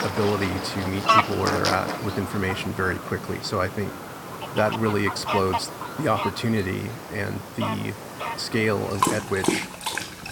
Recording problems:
animal sounds; loud; throughout; 2 dB below the speech
background music; faint; throughout; 20 dB below the speech
murmuring crowd; faint; throughout; 25 dB below the speech

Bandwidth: 17 kHz